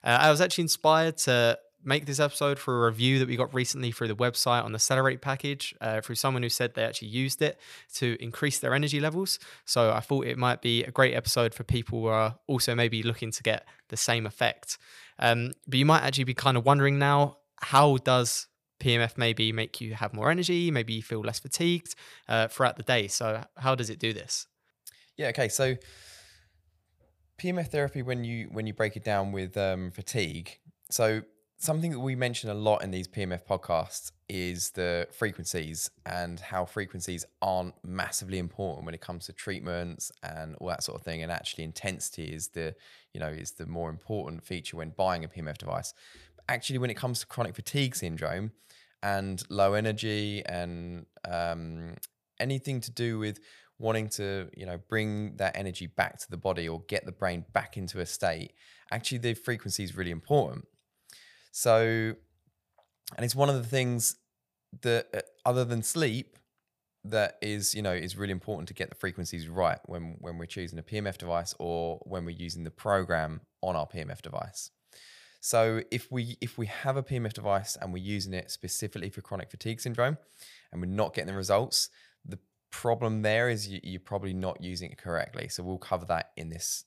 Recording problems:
none

